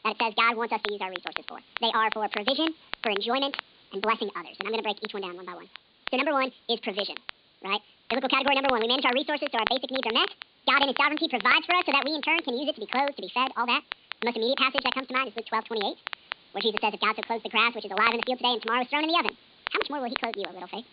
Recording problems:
high frequencies cut off; severe; nothing above 4.5 kHz
wrong speed and pitch; too fast and too high; 1.7 times normal speed
crackle, like an old record; loud; 10 dB below the speech
hiss; faint; throughout; 30 dB below the speech

